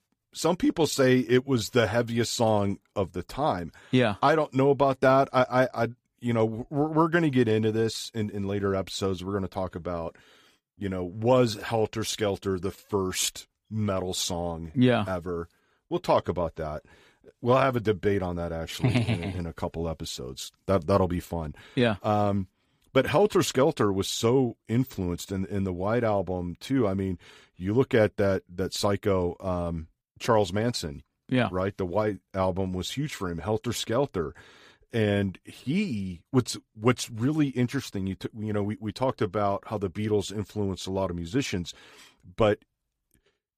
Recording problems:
none

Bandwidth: 15 kHz